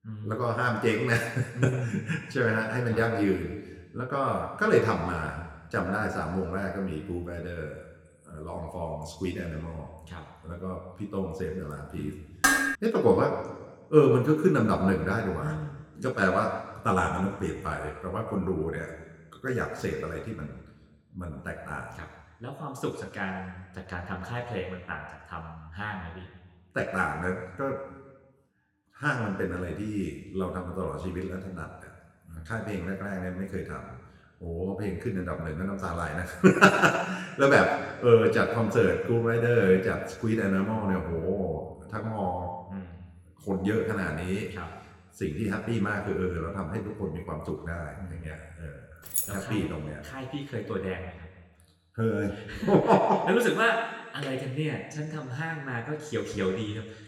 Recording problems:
room echo; slight; dies away in 1.3 s
off-mic speech; somewhat distant
clattering dishes; loud; at 12 s; peak 6 dB above the speech
jangling keys; noticeable; at 49 s; peak level with the speech

